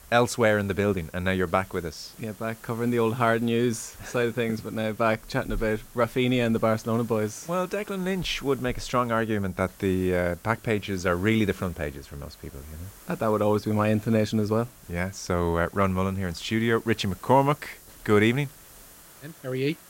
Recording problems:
hiss; faint; throughout; 20 dB below the speech

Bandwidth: 16 kHz